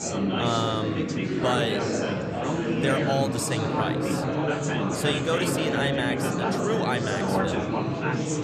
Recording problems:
chatter from many people; very loud; throughout; 3 dB above the speech

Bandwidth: 14 kHz